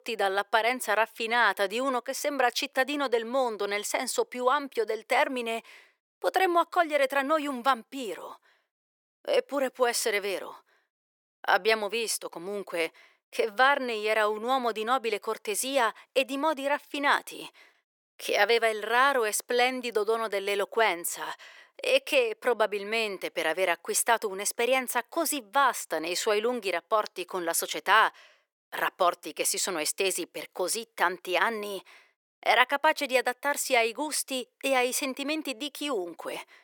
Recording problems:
thin; somewhat; fading below 400 Hz

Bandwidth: 18.5 kHz